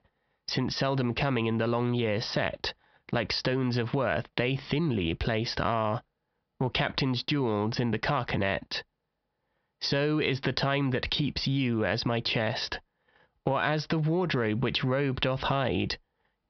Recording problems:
squashed, flat; heavily
high frequencies cut off; noticeable; nothing above 5.5 kHz

